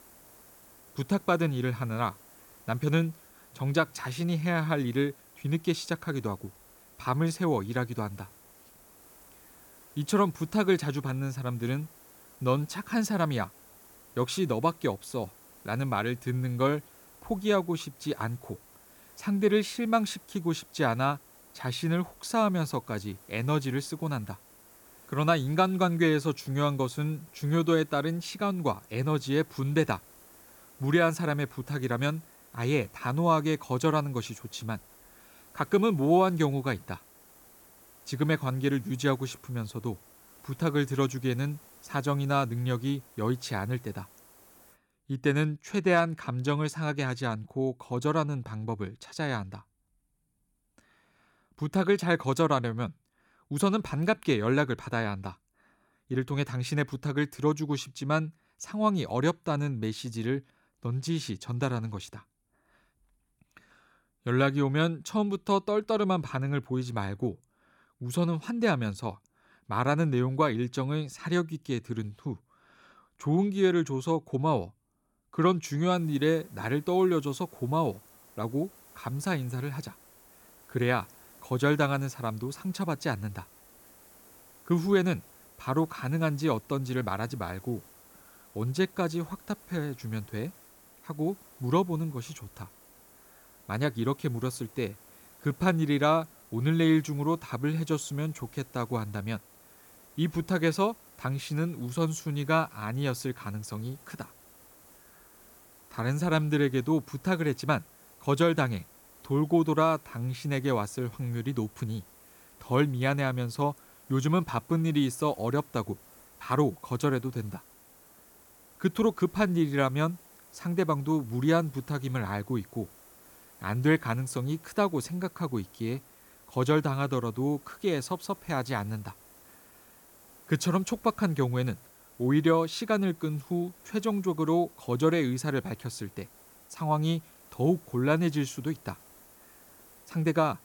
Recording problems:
hiss; faint; until 45 s and from 1:16 on; 25 dB below the speech

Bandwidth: 18 kHz